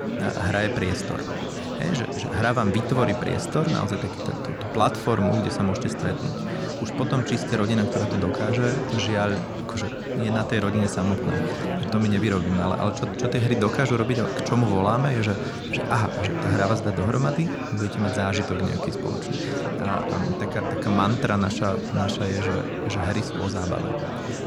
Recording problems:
chatter from many people; loud; throughout; 3 dB below the speech

